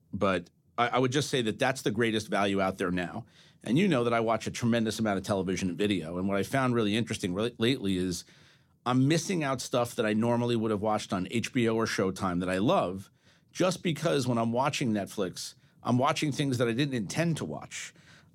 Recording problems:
none

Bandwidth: 17 kHz